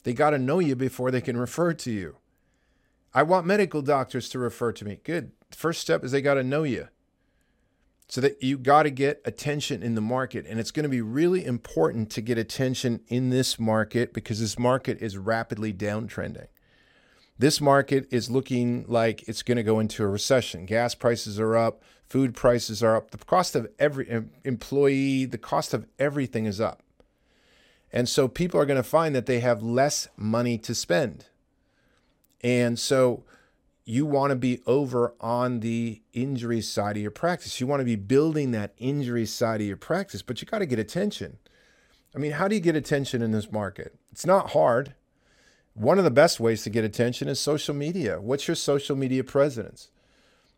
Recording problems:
none

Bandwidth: 16 kHz